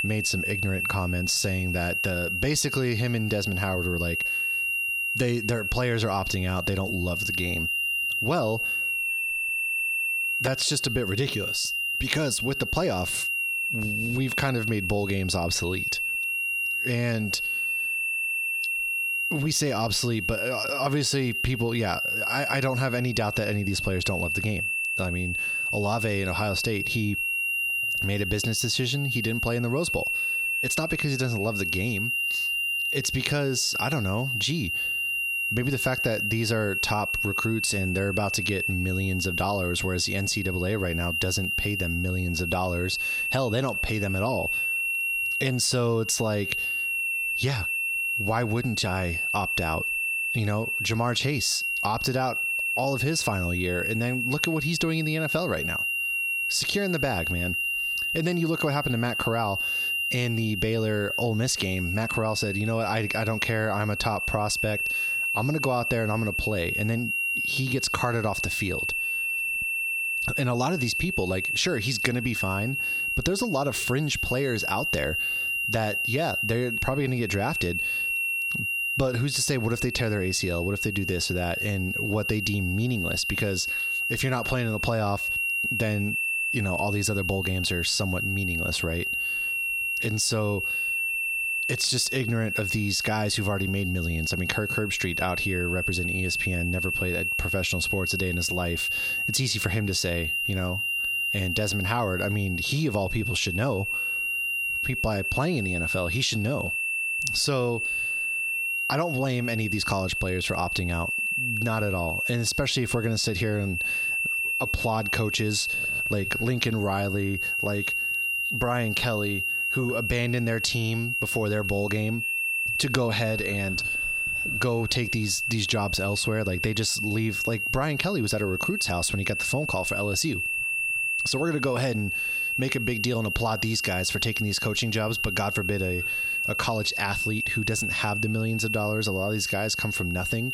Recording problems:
squashed, flat; heavily
high-pitched whine; loud; throughout; 2.5 kHz, as loud as the speech

